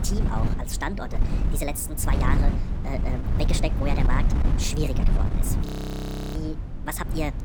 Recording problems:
wrong speed and pitch; too fast and too high; 1.5 times normal speed
wind noise on the microphone; heavy; 4 dB below the speech
audio freezing; at 5.5 s for 0.5 s

